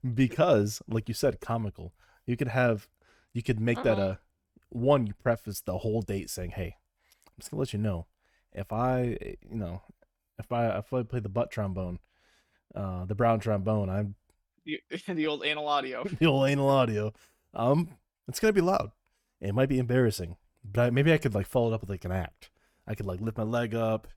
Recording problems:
none

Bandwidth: 19 kHz